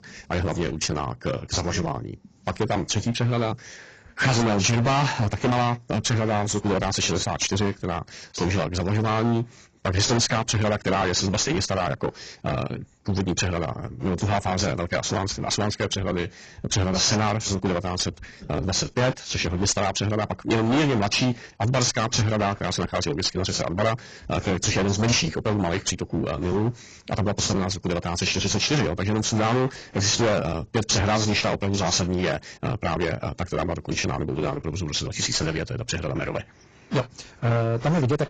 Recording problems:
distortion; heavy; 18% of the sound clipped
garbled, watery; badly; nothing above 7.5 kHz
wrong speed, natural pitch; too fast; 1.6 times normal speed

